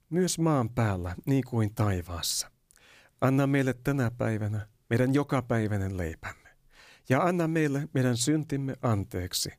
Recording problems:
none

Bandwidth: 15 kHz